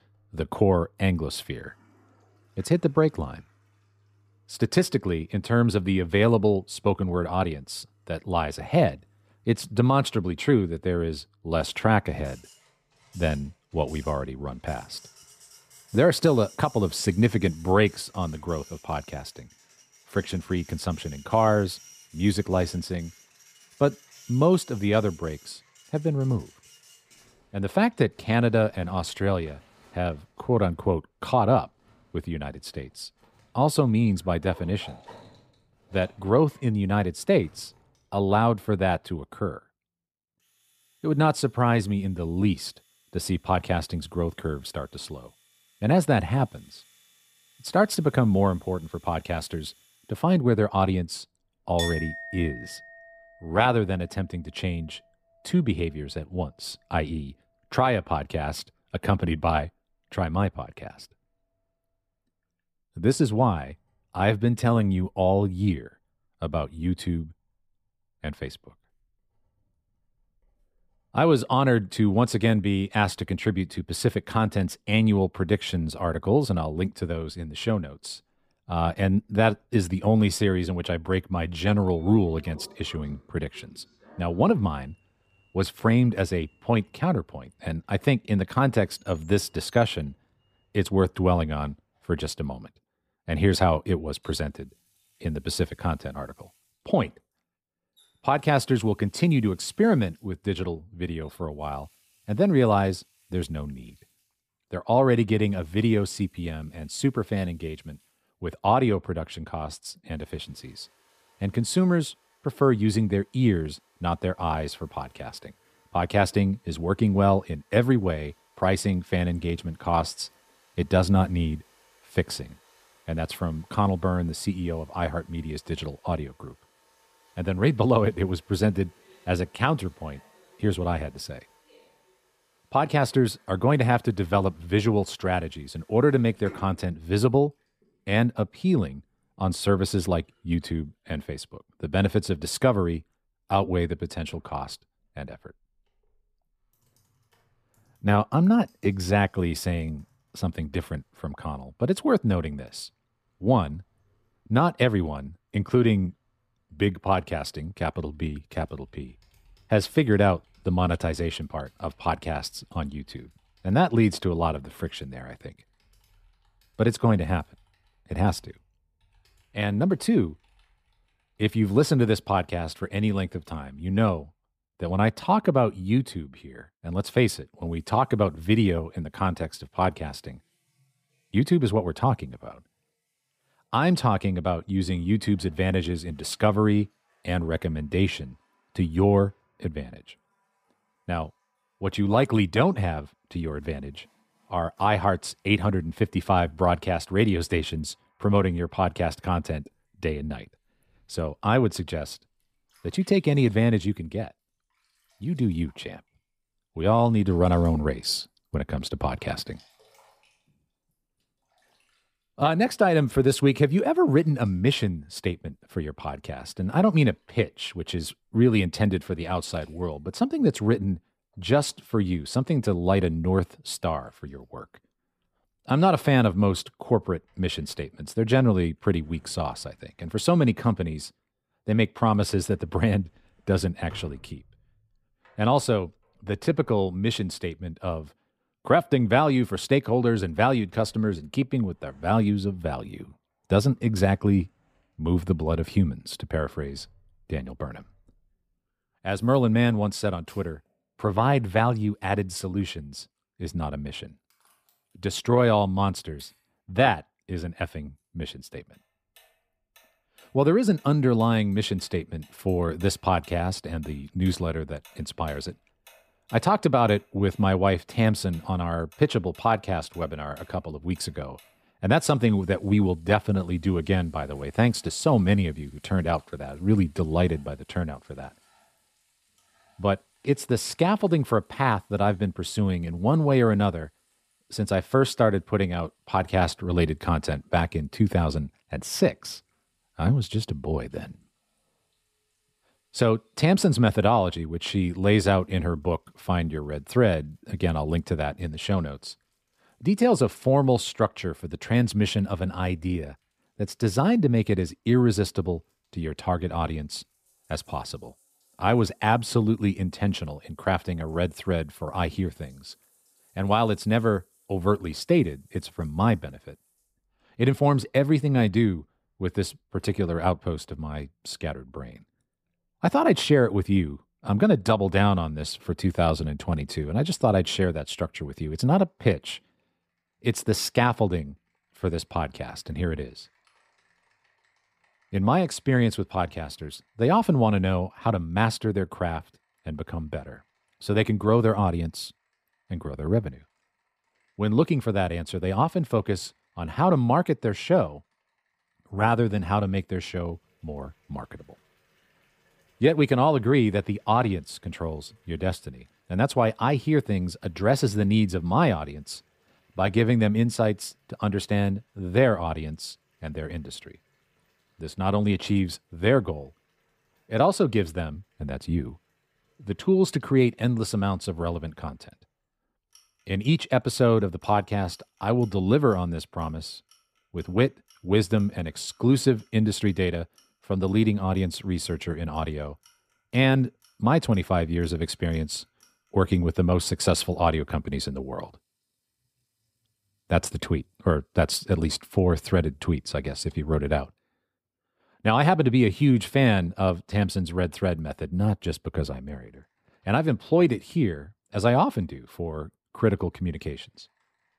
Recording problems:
household noises; faint; throughout; 30 dB below the speech

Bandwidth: 15 kHz